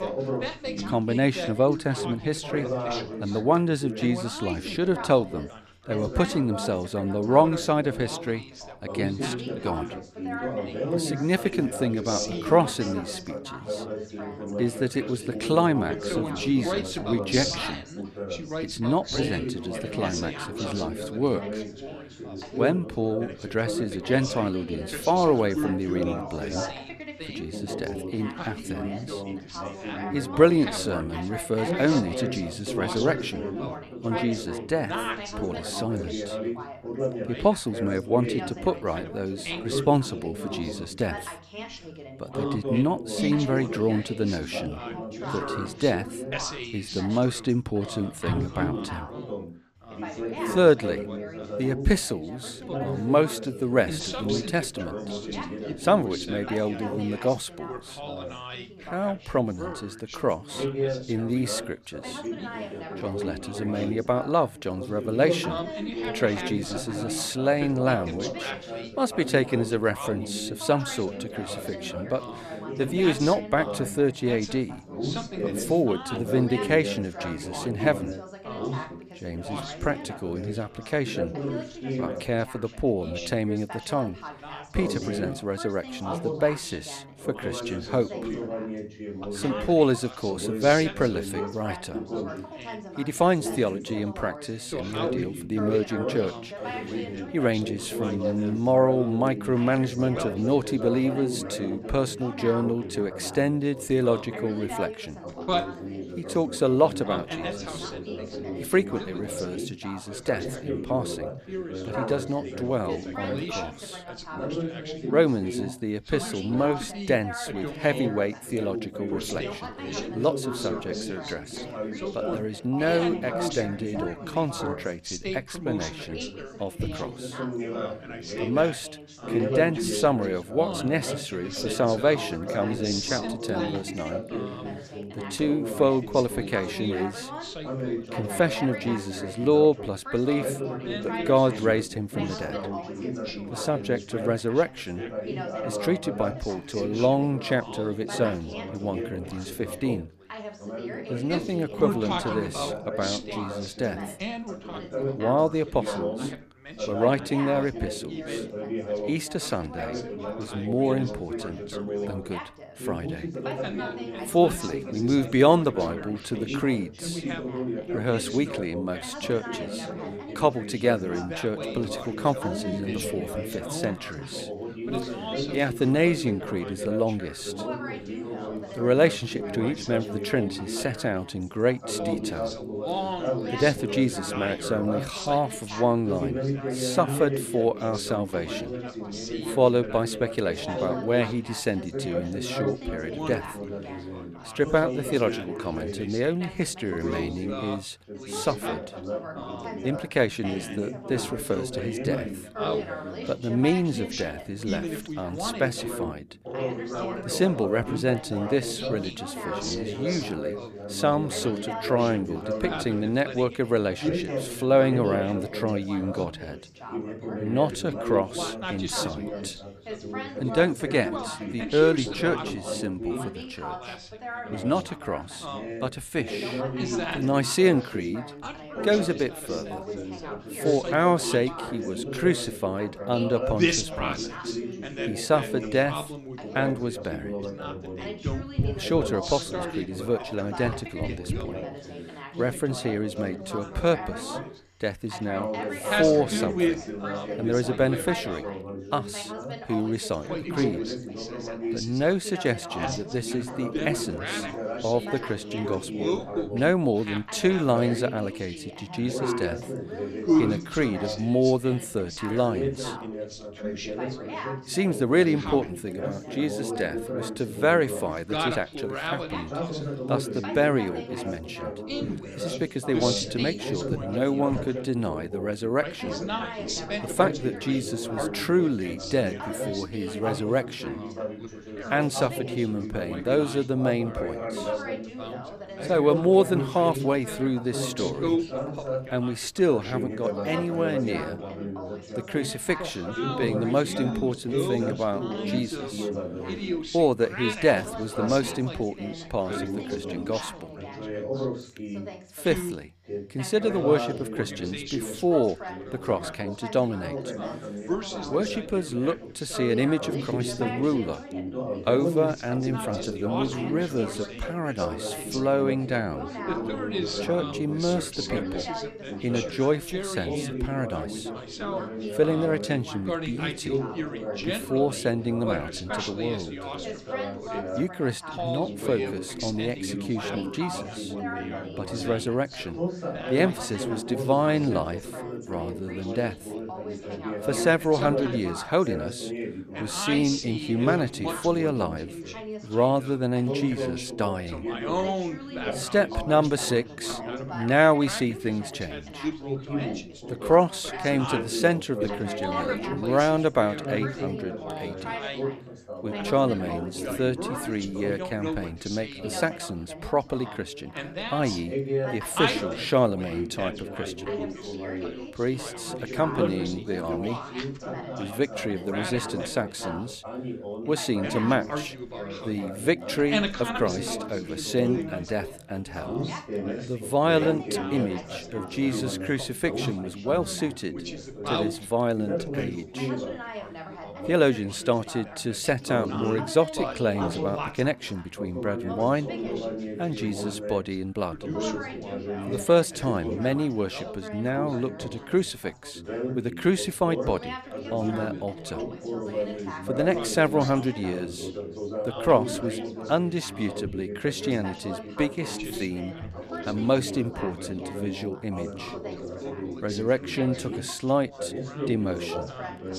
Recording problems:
background chatter; loud; throughout; 3 voices, 6 dB below the speech

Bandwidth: 15 kHz